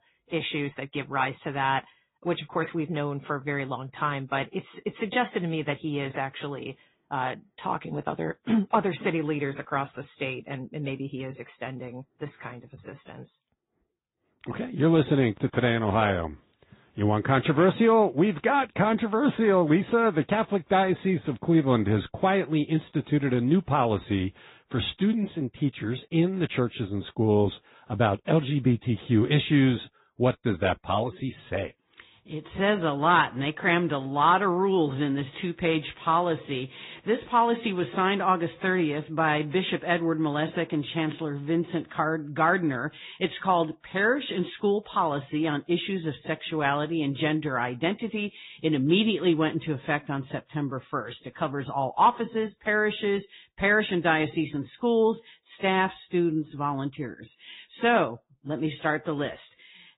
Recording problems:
high frequencies cut off; severe; nothing above 4 kHz
garbled, watery; slightly

